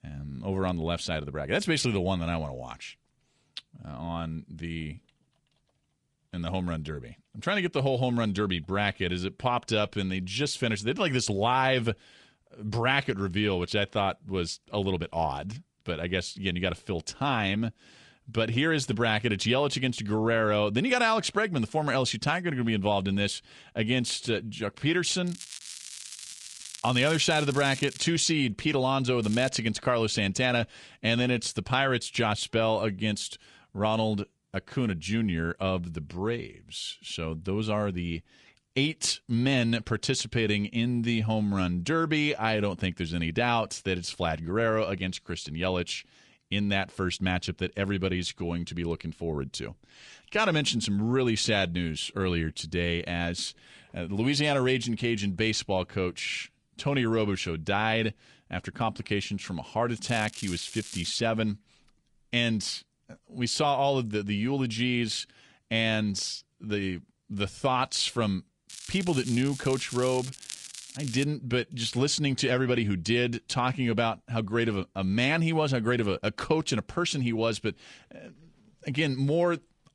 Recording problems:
garbled, watery; slightly
crackling; noticeable; 4 times, first at 25 s; 10 dB below the speech

